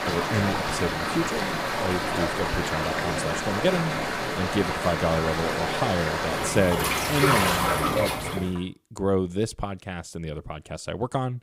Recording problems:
rain or running water; very loud; until 8.5 s; 3 dB above the speech

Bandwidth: 15.5 kHz